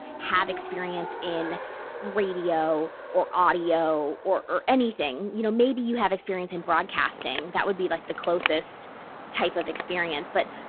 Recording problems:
phone-call audio; poor line
traffic noise; noticeable; throughout; 10 dB below the speech

